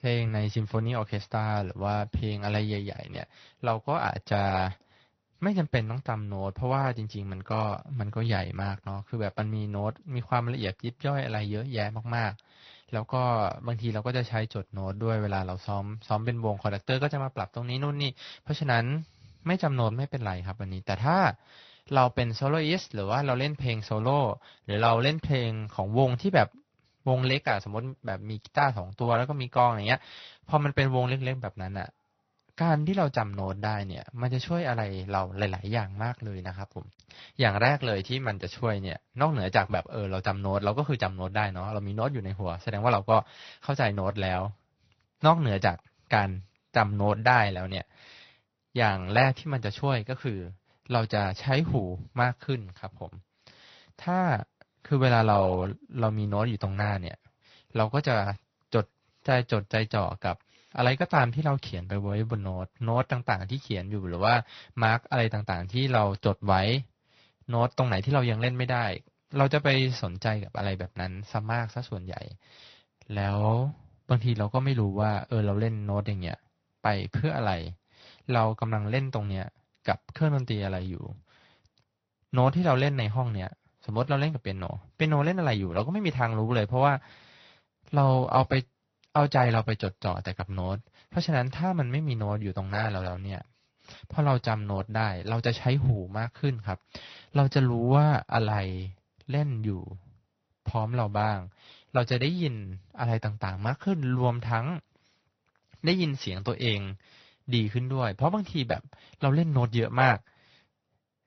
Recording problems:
high frequencies cut off; noticeable; nothing above 5 kHz
garbled, watery; slightly

